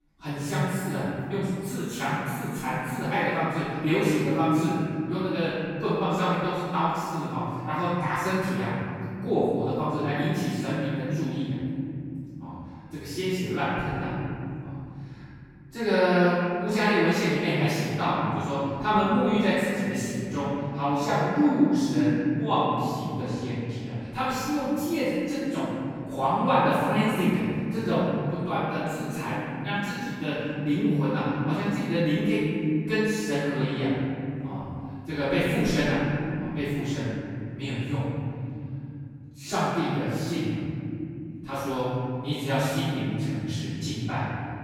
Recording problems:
room echo; strong; dies away in 3 s
off-mic speech; far
echo of what is said; faint; from 18 s on; 170 ms later, 25 dB below the speech

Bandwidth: 17 kHz